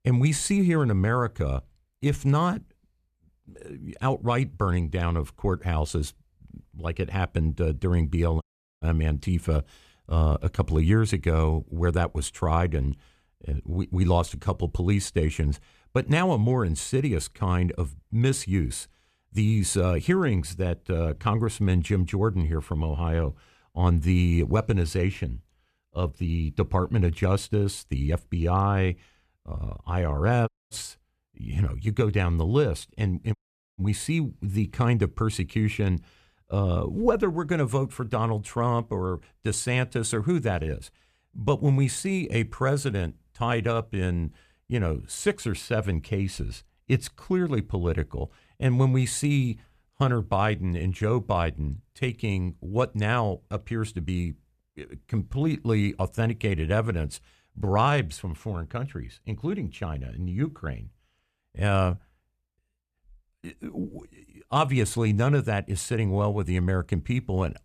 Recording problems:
audio cutting out; at 8.5 s, at 30 s and at 33 s

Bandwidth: 14.5 kHz